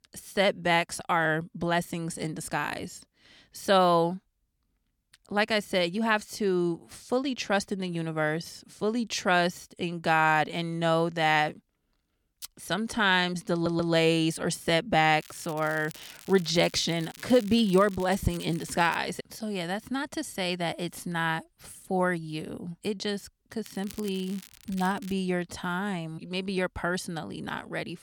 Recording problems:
crackling; noticeable; from 15 to 19 s and from 24 to 25 s; 20 dB below the speech
audio stuttering; at 14 s

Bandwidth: 18.5 kHz